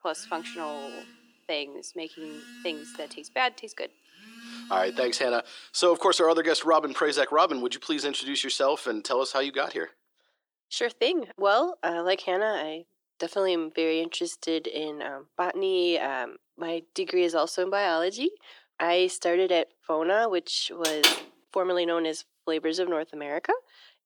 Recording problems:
thin; very; fading below 300 Hz
phone ringing; faint; until 5.5 s; peak 15 dB below the speech
door banging; loud; at 21 s; peak 6 dB above the speech

